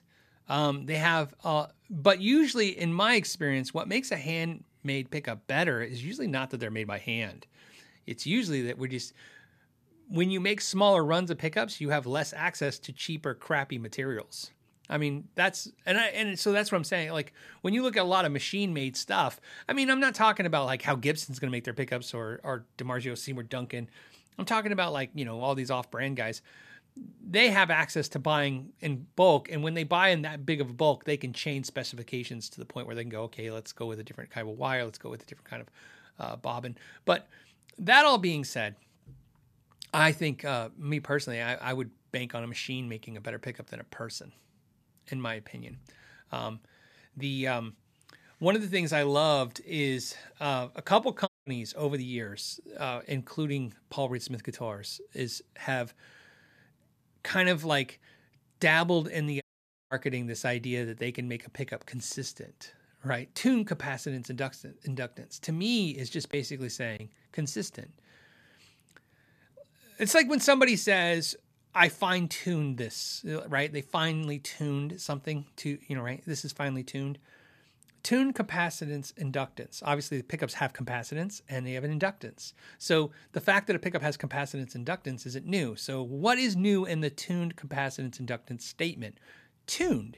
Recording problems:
audio cutting out; at 51 s and at 59 s

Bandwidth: 14.5 kHz